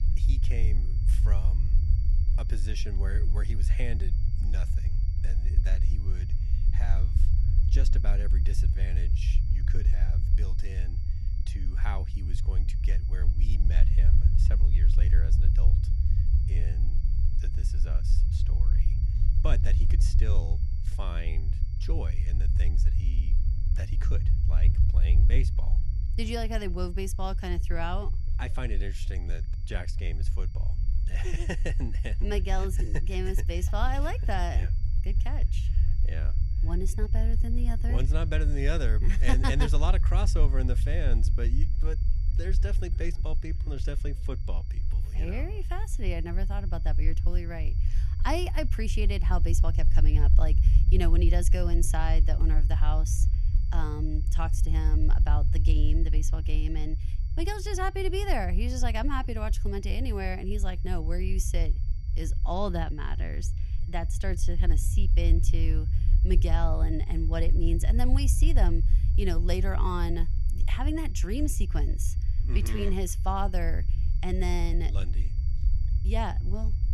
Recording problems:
low rumble; noticeable; throughout; 10 dB below the speech
high-pitched whine; faint; throughout; 4.5 kHz, 25 dB below the speech

